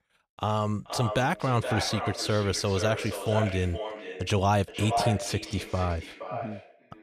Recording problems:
echo of what is said; strong; throughout; 470 ms later, 7 dB below the speech

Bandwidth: 14.5 kHz